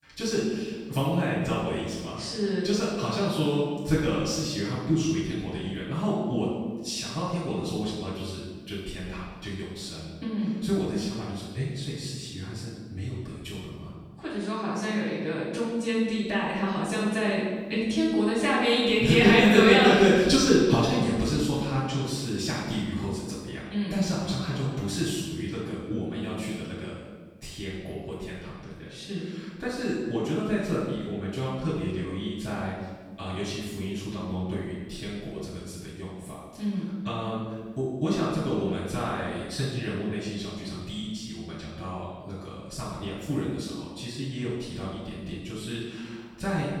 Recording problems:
room echo; strong; dies away in 1.2 s
off-mic speech; far

